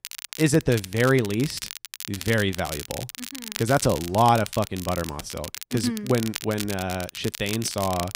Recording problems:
crackle, like an old record; noticeable; 10 dB below the speech

